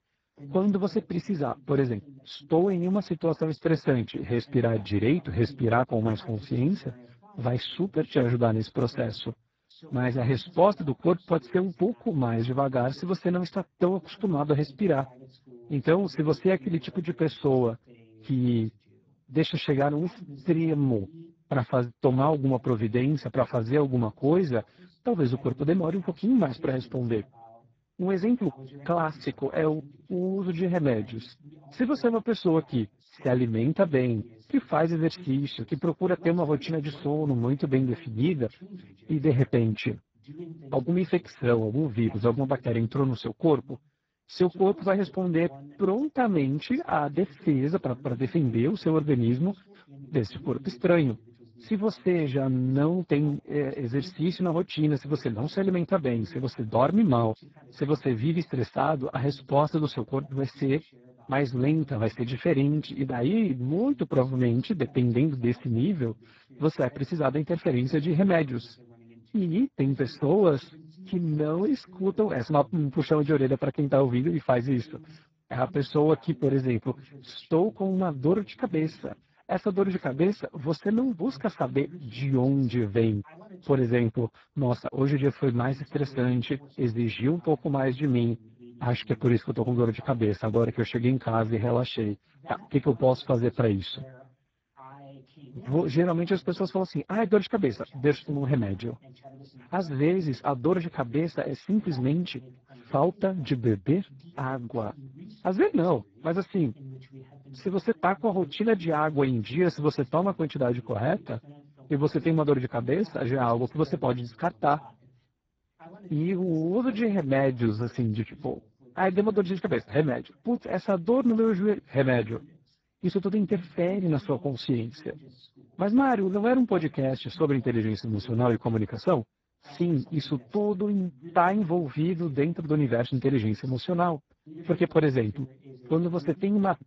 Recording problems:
garbled, watery; badly
voice in the background; faint; throughout; 25 dB below the speech

